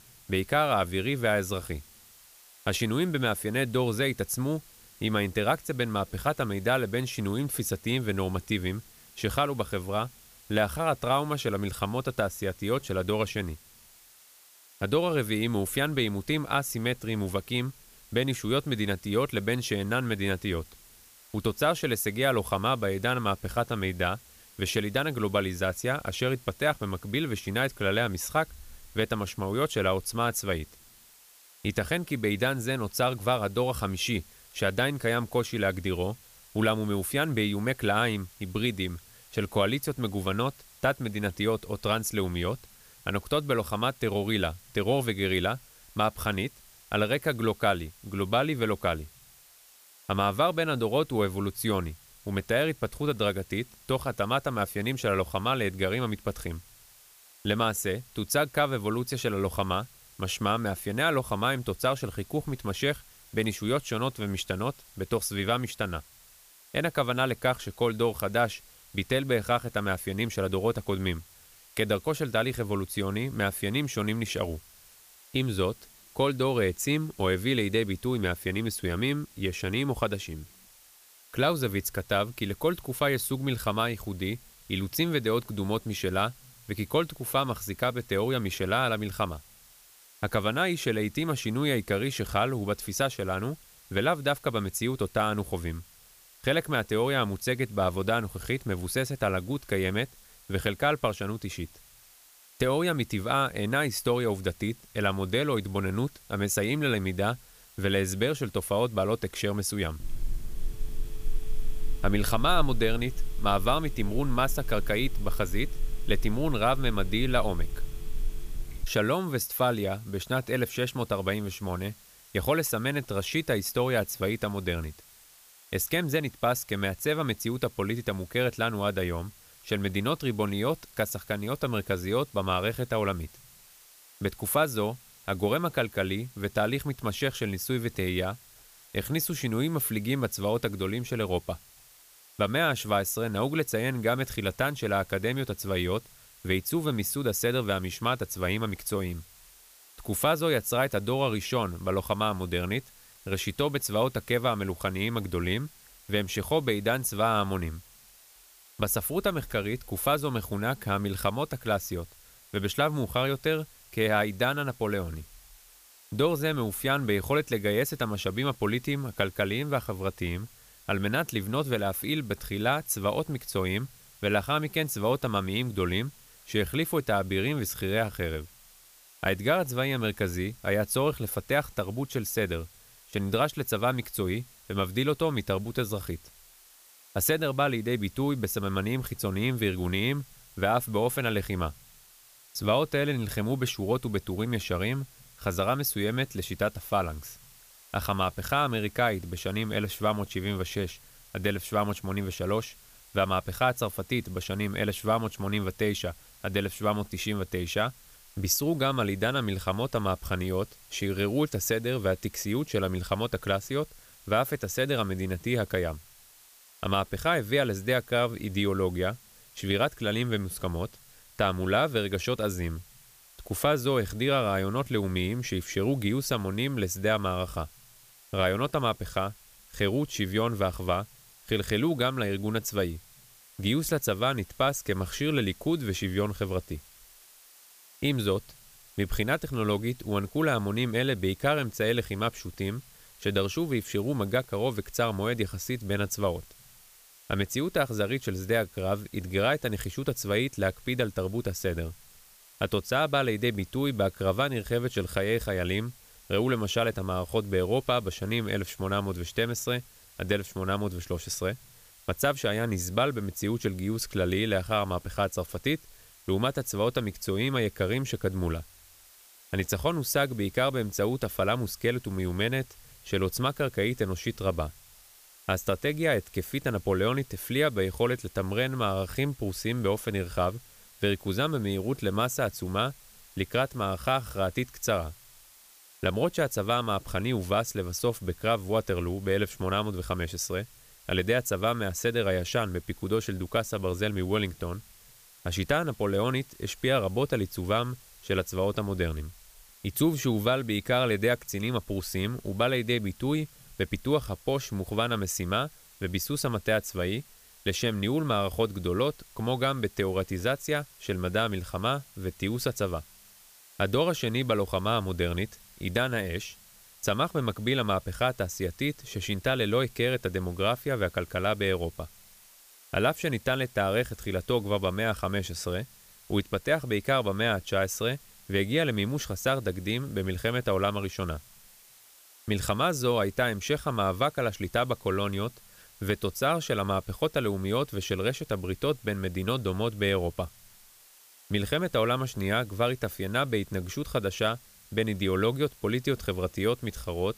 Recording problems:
hiss; faint; throughout; 25 dB below the speech
phone ringing; noticeable; from 1:50 to 1:59; peak 9 dB below the speech

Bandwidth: 15 kHz